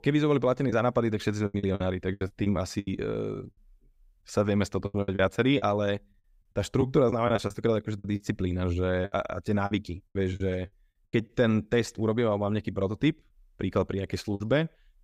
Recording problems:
choppy; very; 10% of the speech affected

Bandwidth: 15.5 kHz